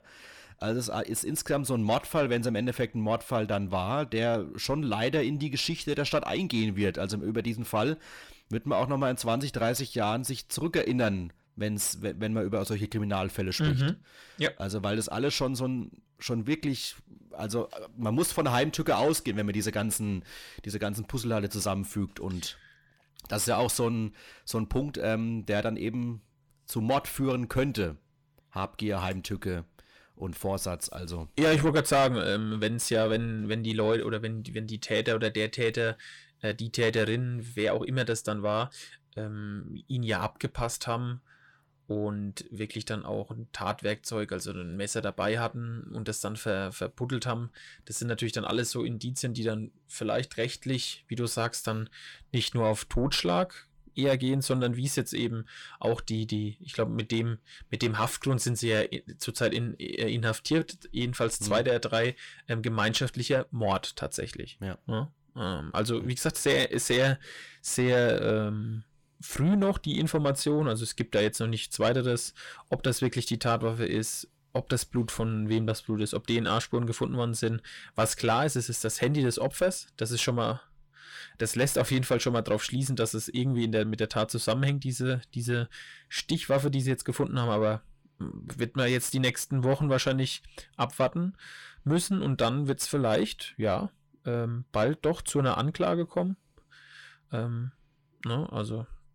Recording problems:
distortion; slight; 10 dB below the speech

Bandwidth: 17.5 kHz